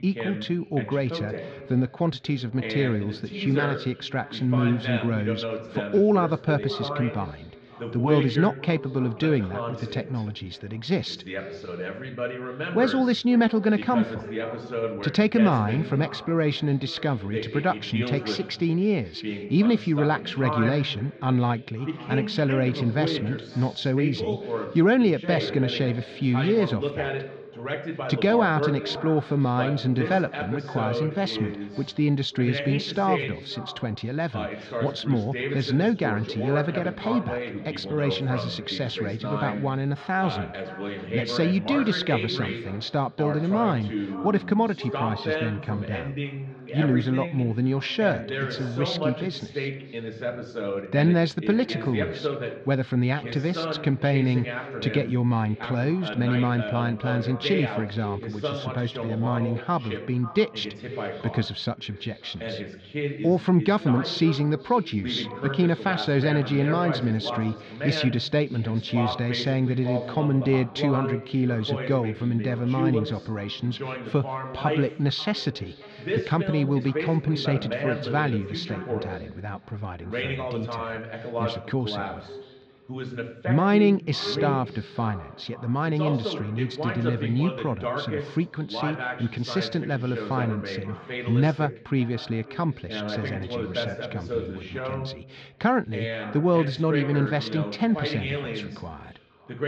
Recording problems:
echo of what is said; noticeable; throughout; 540 ms later, 15 dB below the speech
muffled; slightly; fading above 3.5 kHz
voice in the background; loud; throughout; 7 dB below the speech

